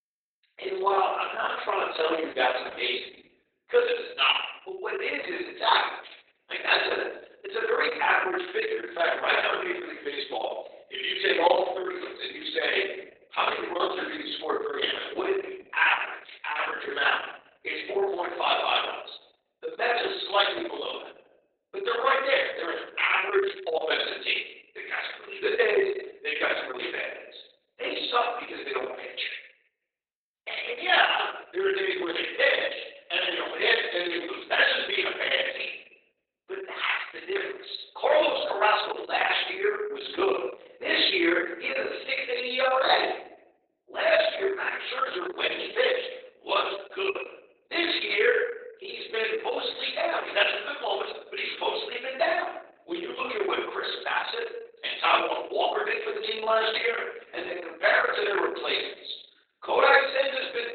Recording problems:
off-mic speech; far
garbled, watery; badly; nothing above 4 kHz
thin; very; fading below 350 Hz
room echo; noticeable; dies away in 0.6 s

